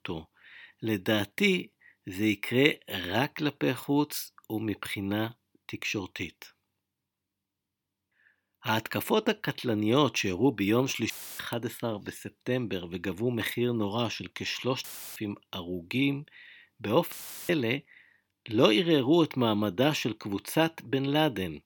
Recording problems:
audio cutting out; filled with static; at 11 s, at 15 s and at 17 s

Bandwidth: 18 kHz